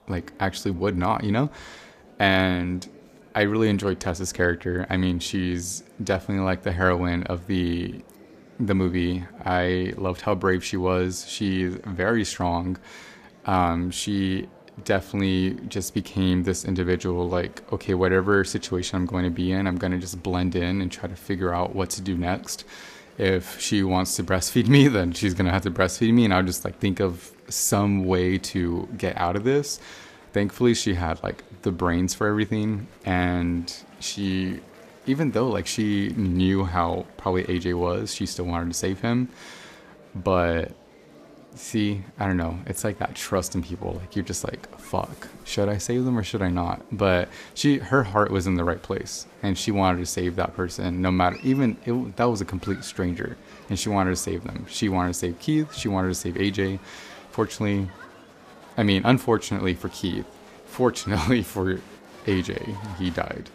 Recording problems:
murmuring crowd; faint; throughout; 25 dB below the speech

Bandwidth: 14.5 kHz